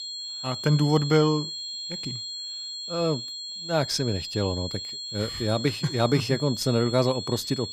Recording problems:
high-pitched whine; loud; throughout; 4 kHz, 7 dB below the speech

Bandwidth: 15 kHz